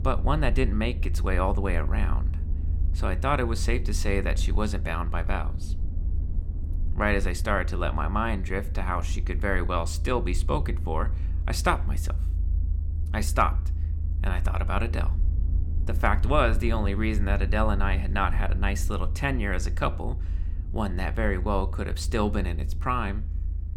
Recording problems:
low rumble; noticeable; throughout; 20 dB below the speech

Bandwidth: 17 kHz